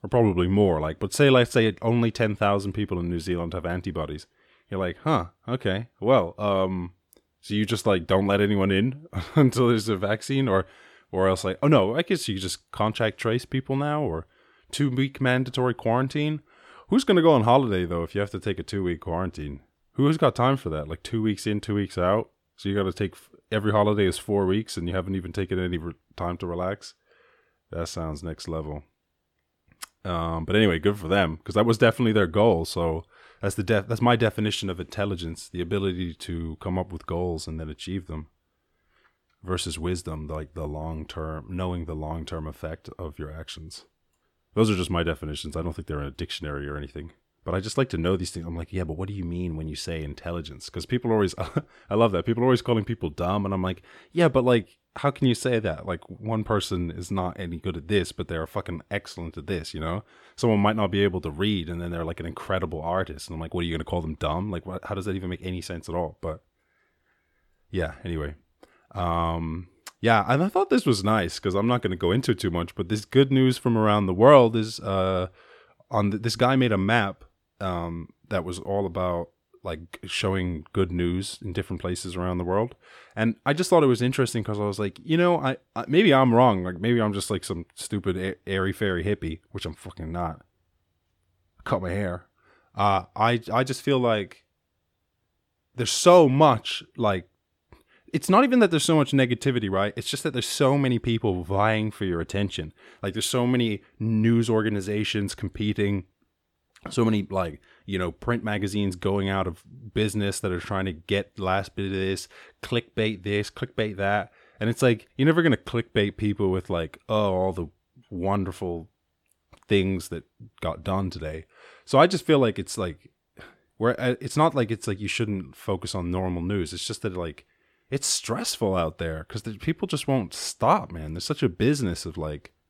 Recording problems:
none

